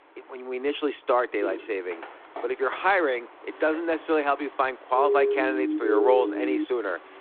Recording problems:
phone-call audio
traffic noise; faint; throughout; 20 dB below the speech
footsteps; noticeable; from 1.5 to 2.5 s; peak 8 dB below the speech
siren; loud; from 5 to 6.5 s; peak 3 dB above the speech

